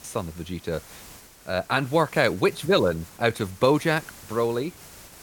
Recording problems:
hiss; faint; throughout; 20 dB below the speech

